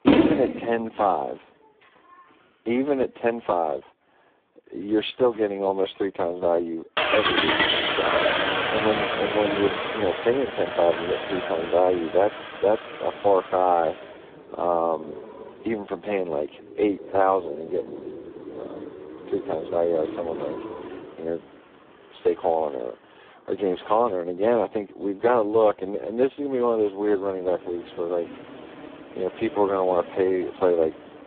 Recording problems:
phone-call audio; poor line
traffic noise; loud; throughout; 3 dB below the speech

